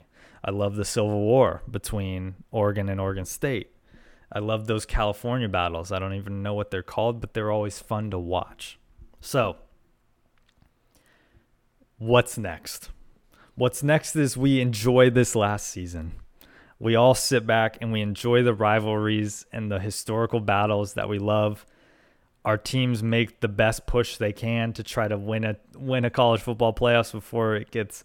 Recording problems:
none

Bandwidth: 18 kHz